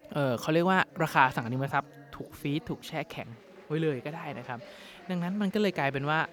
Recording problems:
chatter from many people; faint; throughout; 20 dB below the speech

